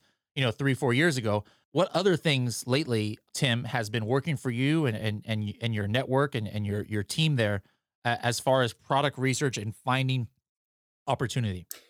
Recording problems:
none

